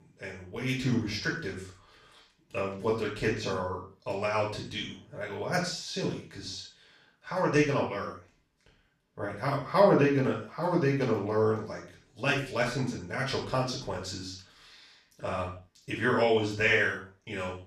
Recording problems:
off-mic speech; far
room echo; noticeable; dies away in 0.4 s

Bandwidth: 14 kHz